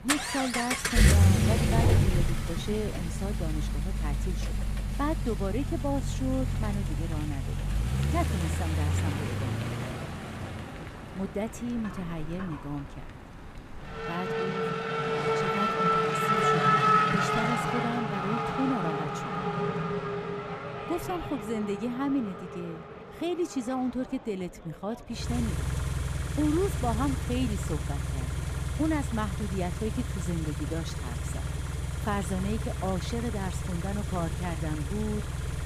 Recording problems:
traffic noise; very loud; throughout; 4 dB above the speech

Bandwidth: 14.5 kHz